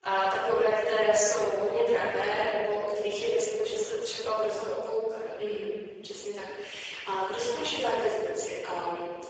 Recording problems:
room echo; strong; dies away in 1.7 s
off-mic speech; far
garbled, watery; badly; nothing above 7.5 kHz
thin; very; fading below 400 Hz

